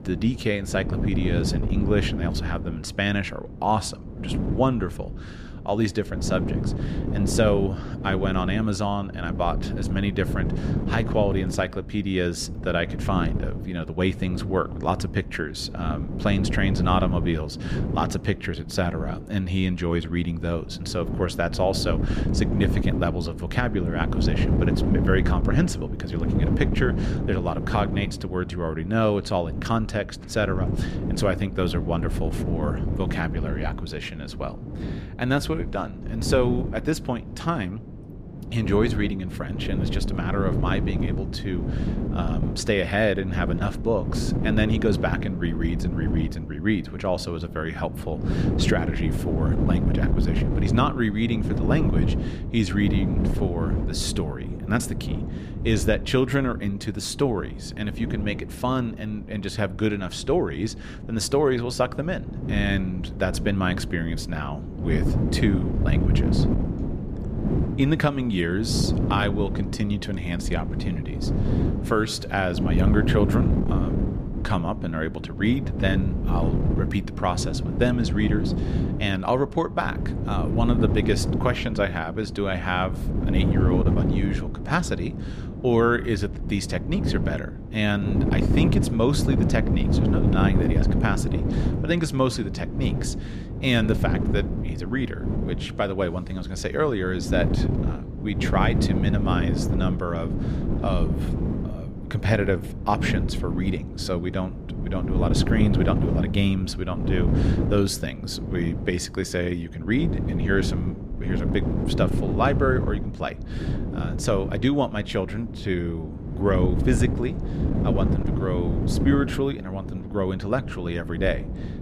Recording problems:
wind noise on the microphone; heavy; 7 dB below the speech

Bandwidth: 14.5 kHz